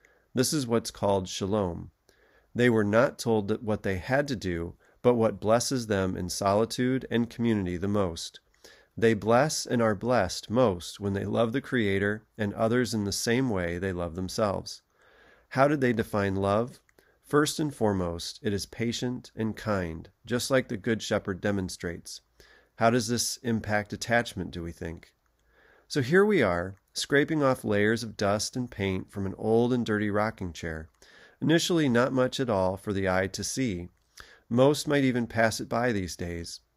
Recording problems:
none

